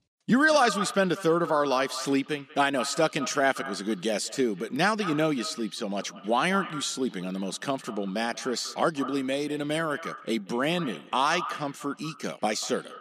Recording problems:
echo of what is said; noticeable; throughout; 190 ms later, 15 dB below the speech

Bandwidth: 14.5 kHz